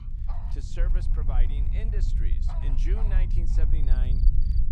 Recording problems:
low rumble; loud; throughout; 2 dB below the speech
animal sounds; noticeable; throughout; 10 dB below the speech
crackle, like an old record; faint; 30 dB below the speech

